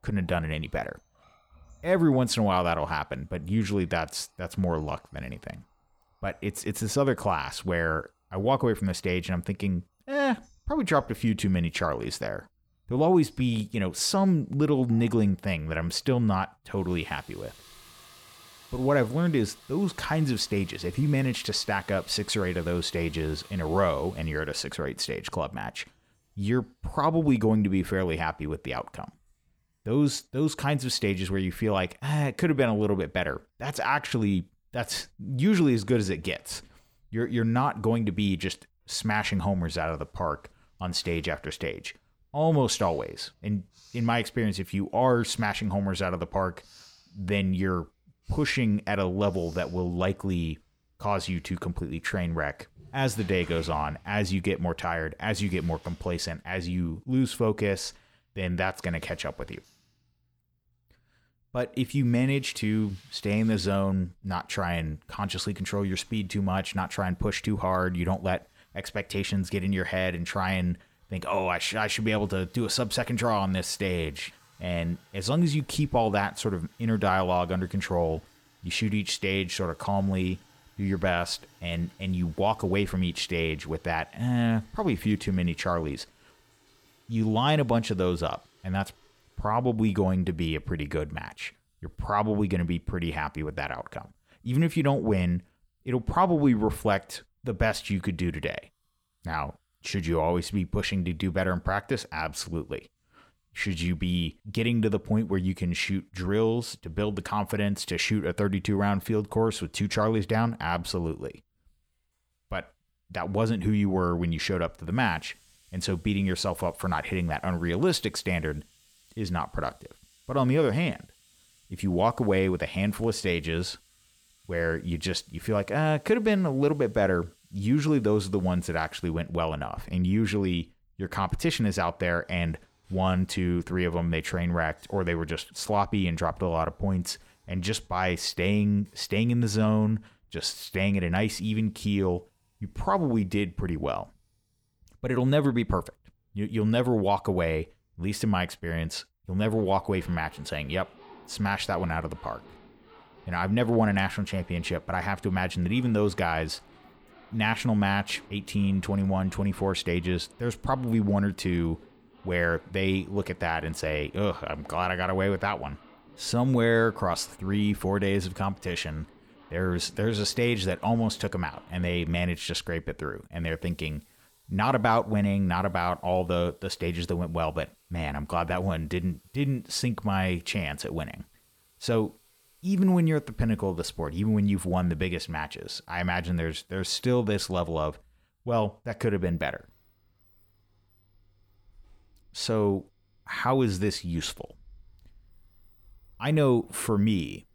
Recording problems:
household noises; faint; throughout; 30 dB below the speech

